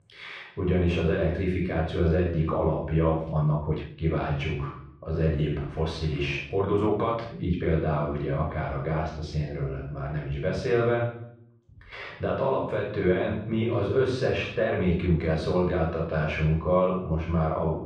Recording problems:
off-mic speech; far
muffled; very; fading above 2.5 kHz
room echo; noticeable; dies away in 0.6 s
uneven, jittery; strongly; from 2 to 15 s

